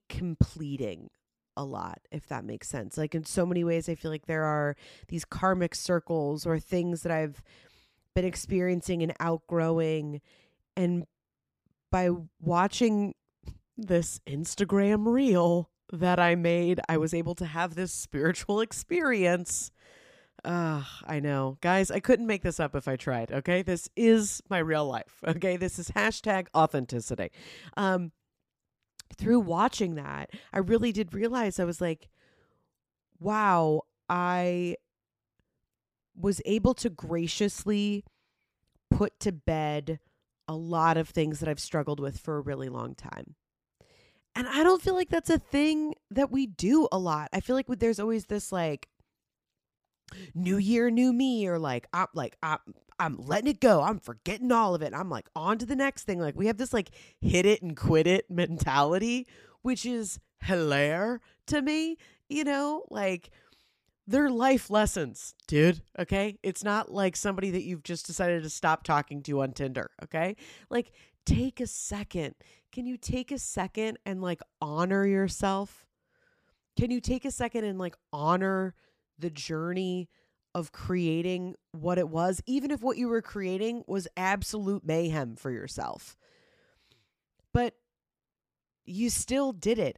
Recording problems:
none

